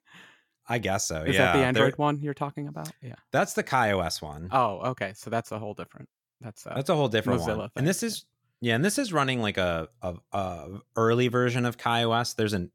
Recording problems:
none

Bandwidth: 17 kHz